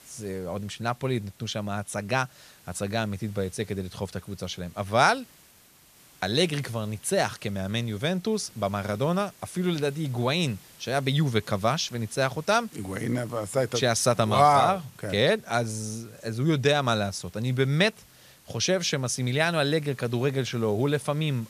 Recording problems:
hiss; faint; throughout; 25 dB below the speech

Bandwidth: 14.5 kHz